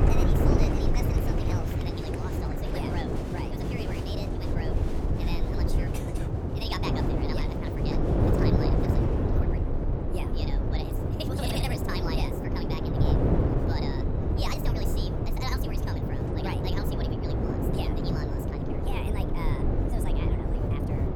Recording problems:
wrong speed and pitch; too fast and too high; 1.5 times normal speed
wind noise on the microphone; heavy; 4 dB above the speech
crowd noise; loud; until 9 s; 8 dB below the speech

